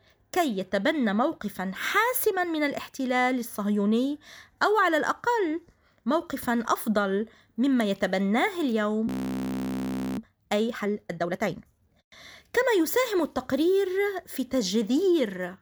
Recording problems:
audio freezing; at 9 s for 1 s

